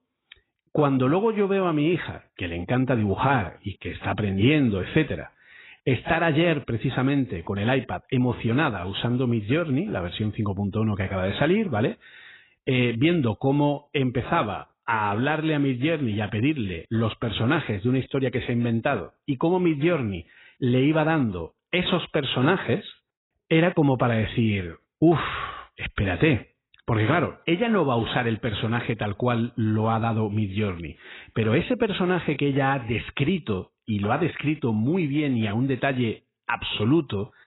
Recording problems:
garbled, watery; badly; nothing above 4 kHz

